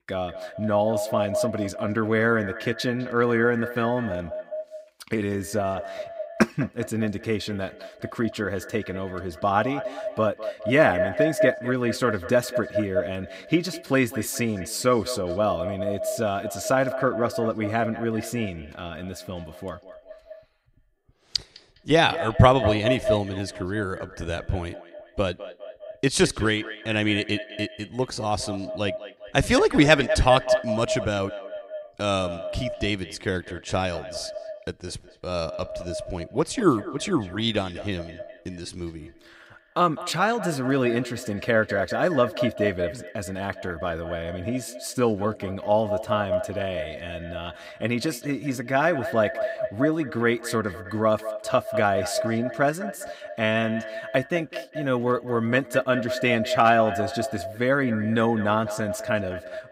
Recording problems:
echo of what is said; strong; throughout; 200 ms later, 8 dB below the speech

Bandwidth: 15.5 kHz